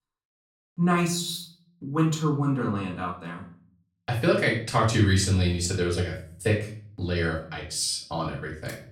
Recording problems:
off-mic speech; far
room echo; slight; dies away in 0.4 s

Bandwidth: 17 kHz